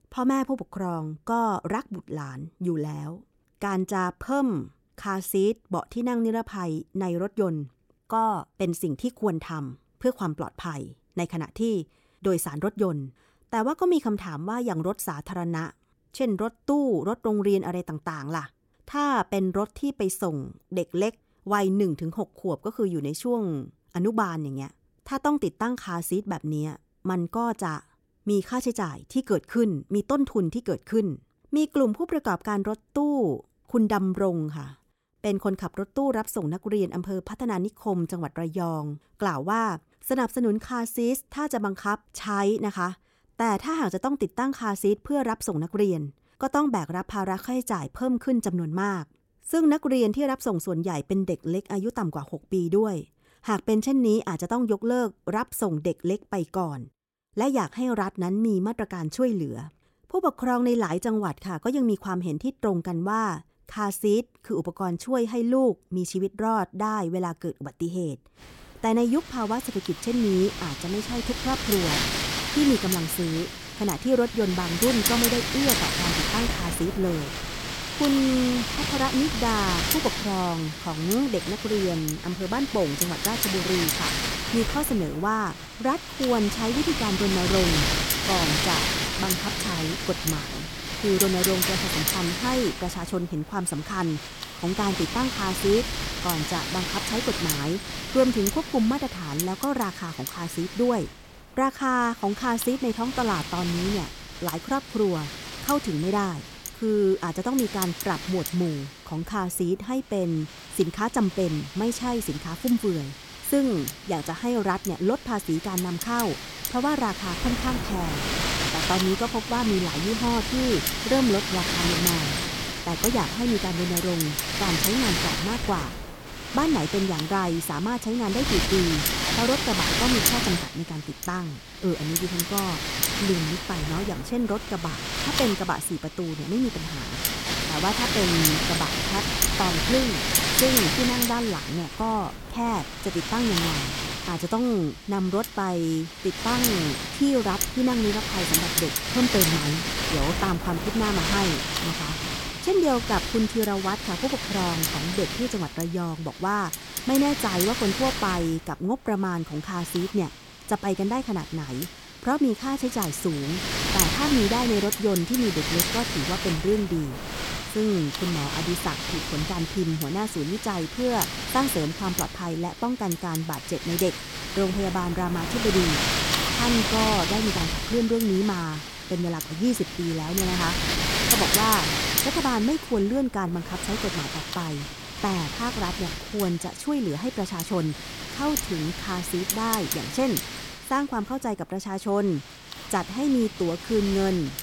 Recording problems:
wind noise on the microphone; heavy; from 1:08 on; 1 dB above the speech

